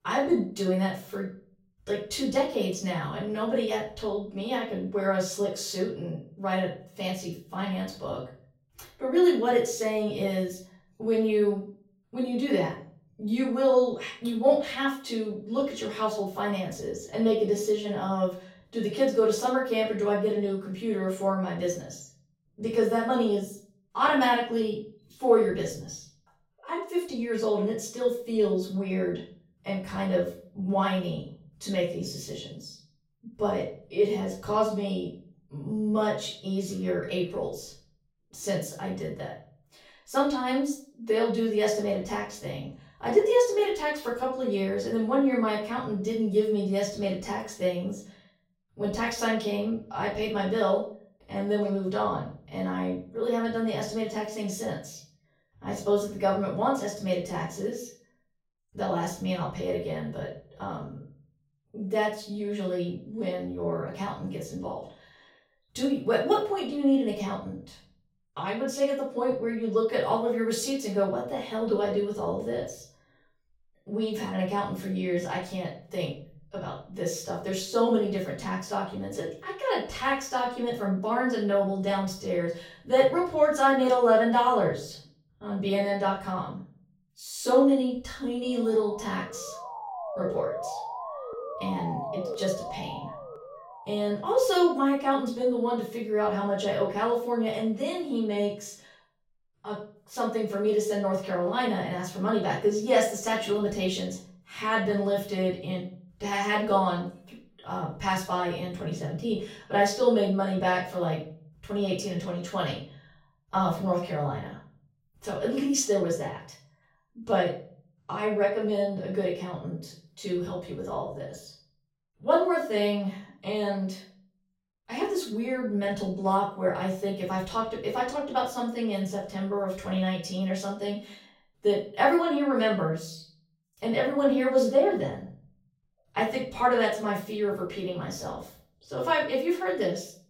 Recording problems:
off-mic speech; far
room echo; slight; dies away in 0.5 s
siren; noticeable; from 1:28 to 1:34; peak 5 dB below the speech

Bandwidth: 16.5 kHz